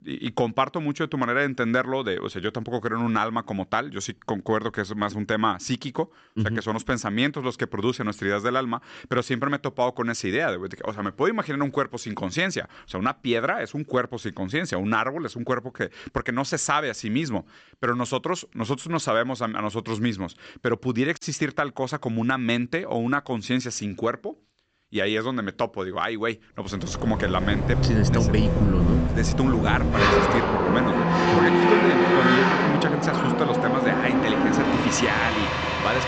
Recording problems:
high frequencies cut off; noticeable; nothing above 8 kHz
traffic noise; very loud; from 27 s on; 4 dB above the speech

